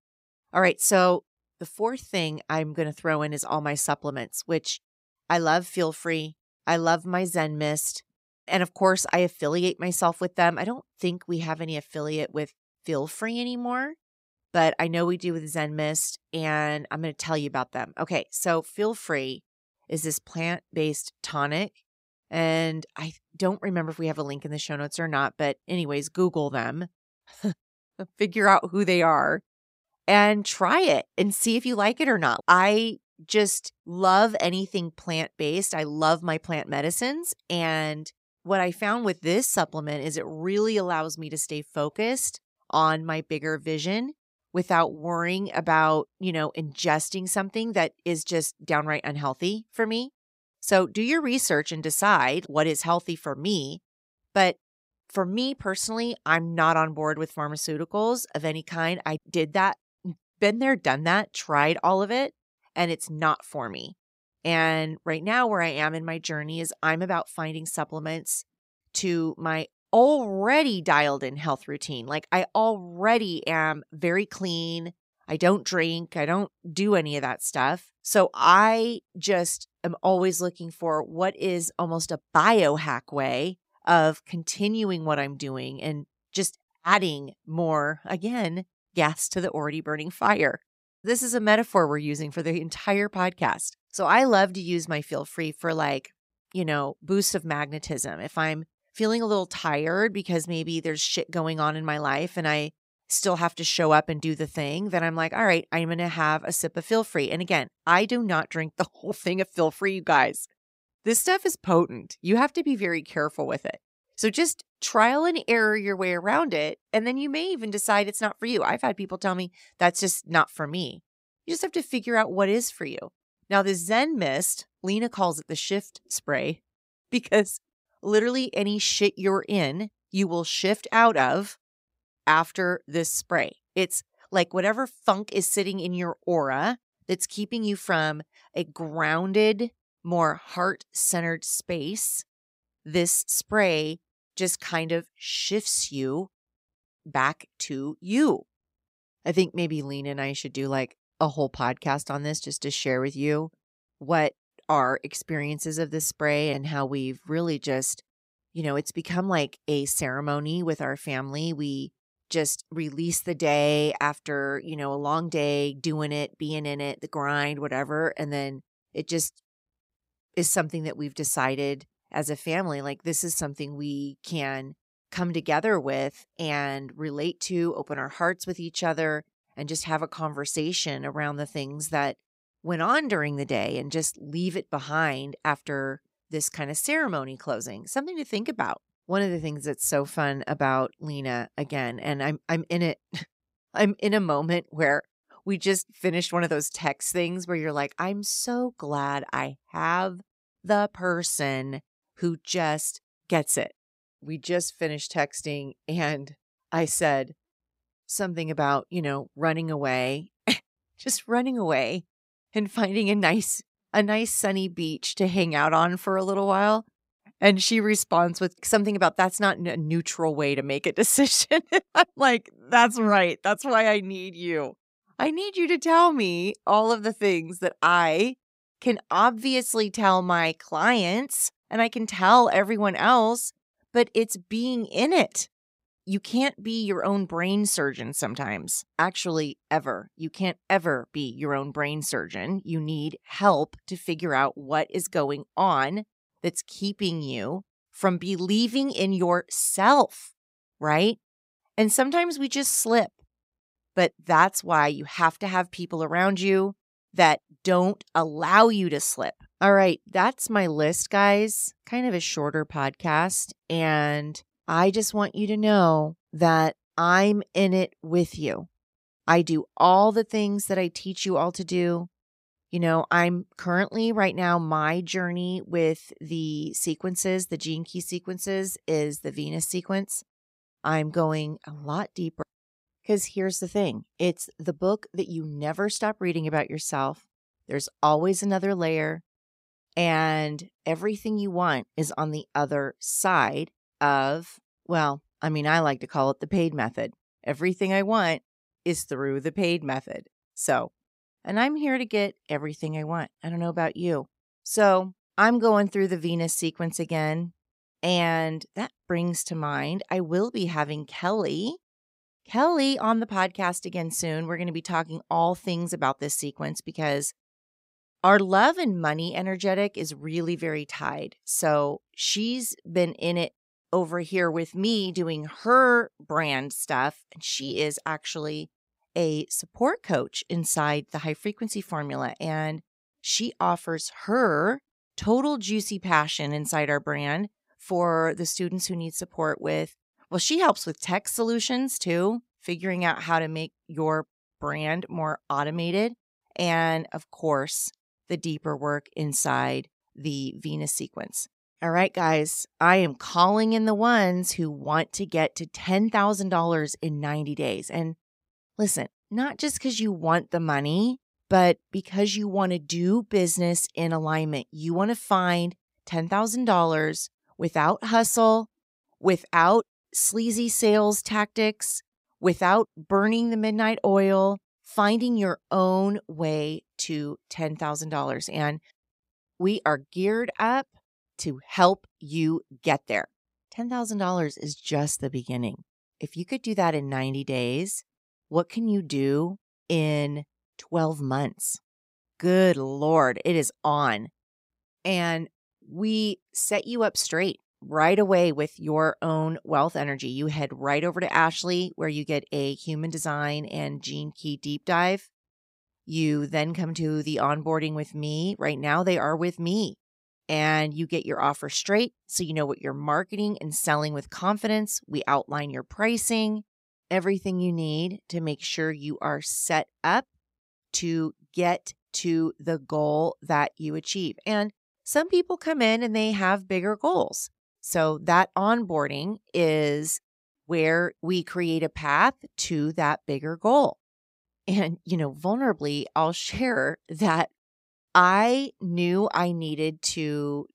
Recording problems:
none

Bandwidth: 15.5 kHz